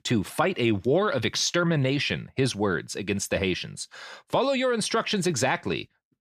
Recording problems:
none

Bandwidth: 14.5 kHz